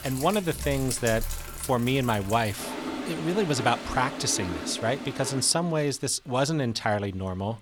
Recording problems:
household noises; loud; throughout; 9 dB below the speech

